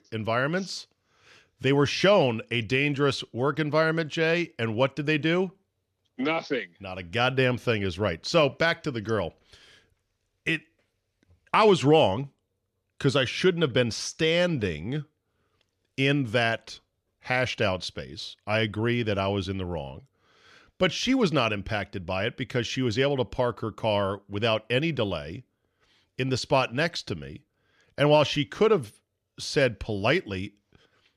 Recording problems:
none

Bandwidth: 14 kHz